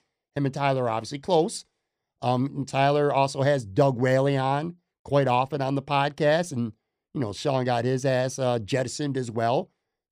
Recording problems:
none

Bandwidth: 15 kHz